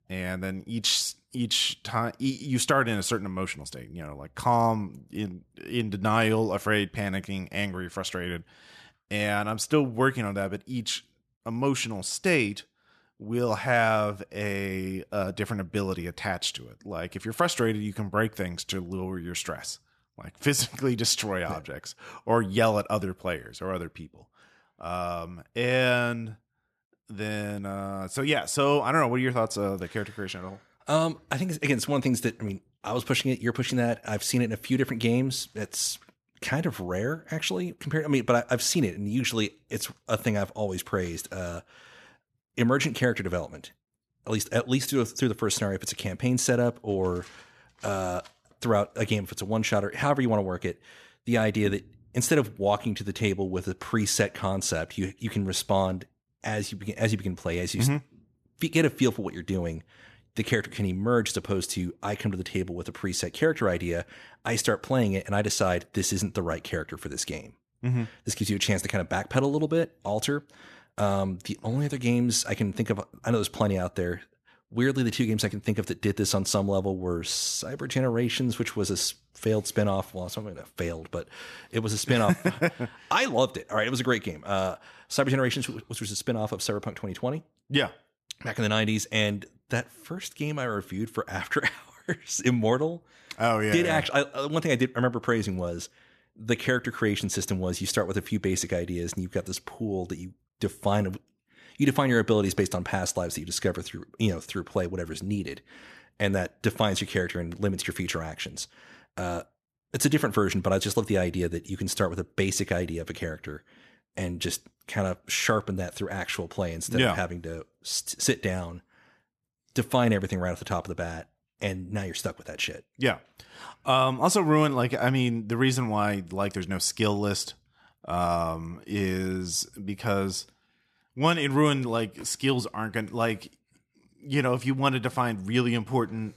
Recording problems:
none

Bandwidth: 14 kHz